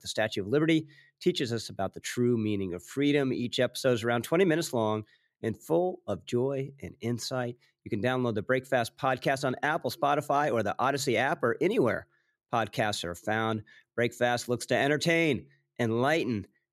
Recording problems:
none

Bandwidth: 13.5 kHz